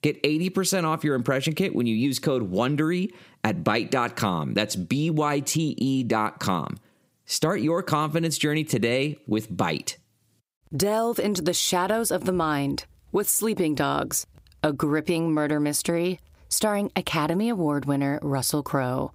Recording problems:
squashed, flat; heavily

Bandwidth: 15.5 kHz